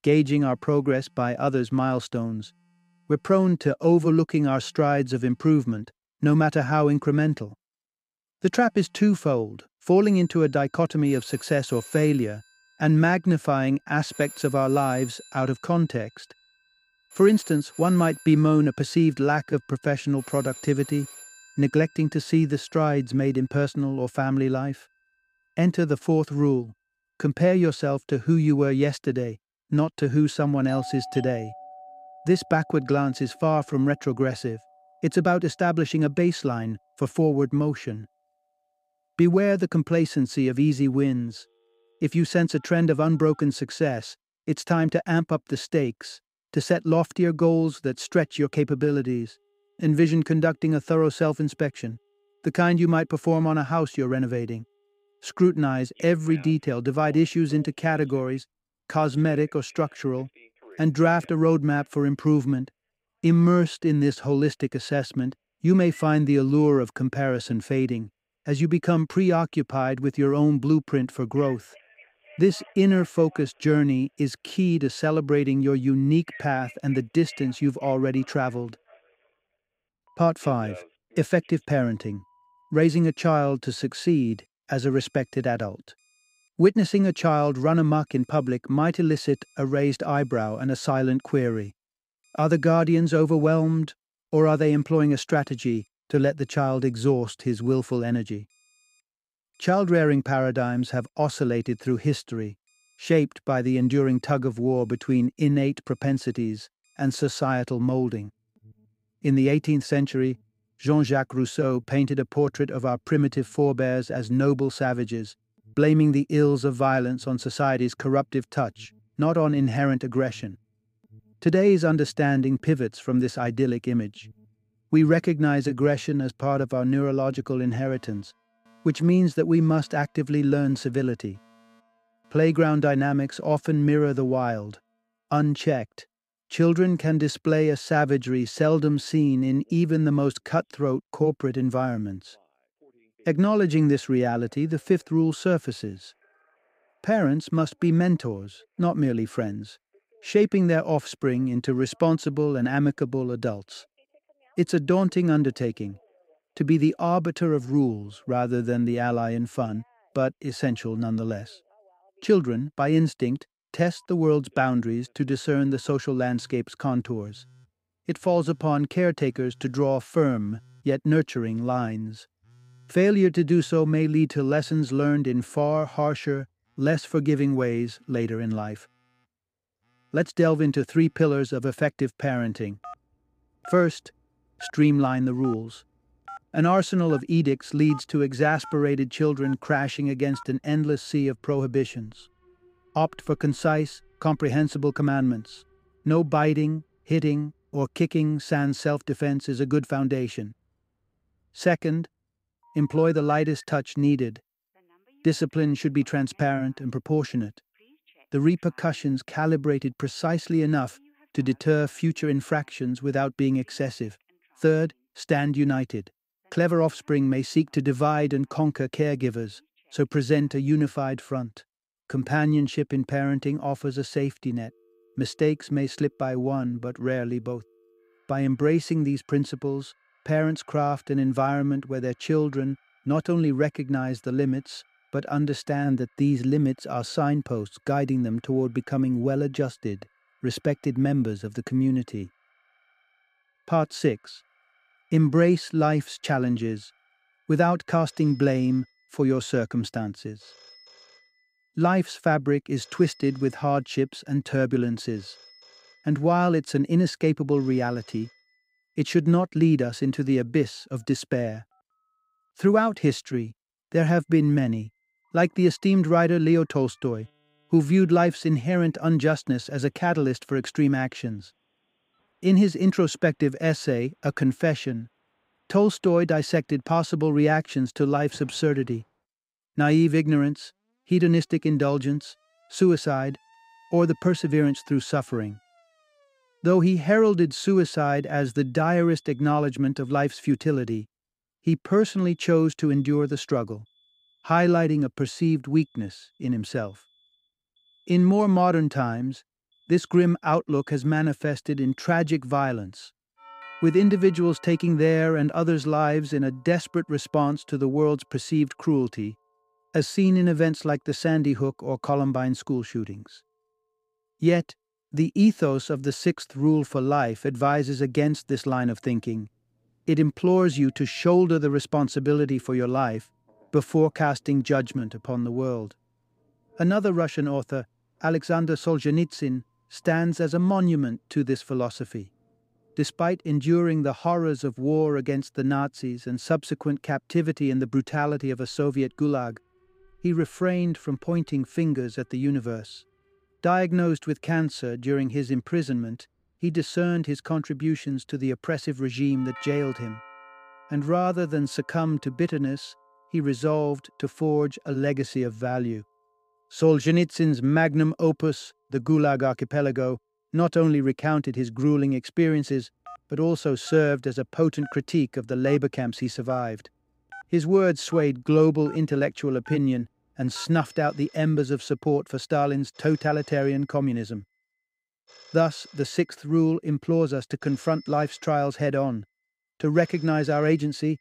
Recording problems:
alarms or sirens; faint; throughout; 25 dB below the speech

